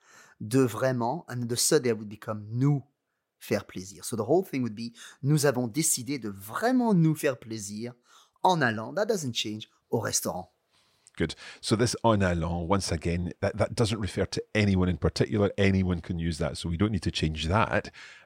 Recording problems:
none

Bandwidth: 16 kHz